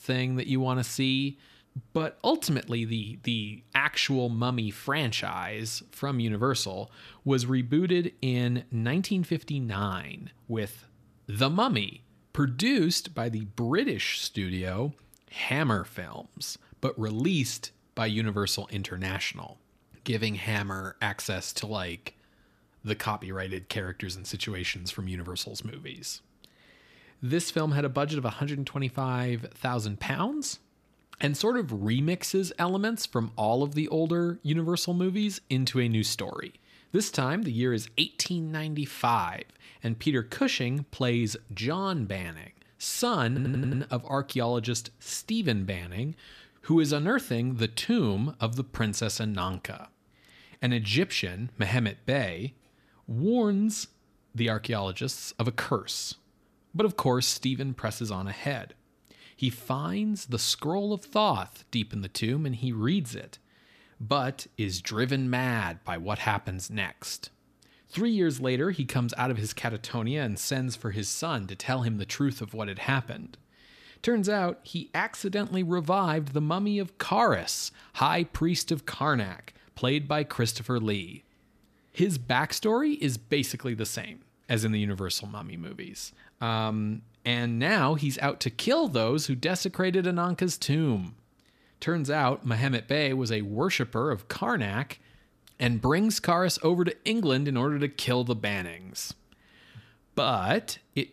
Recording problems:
audio stuttering; at 43 s

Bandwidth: 14.5 kHz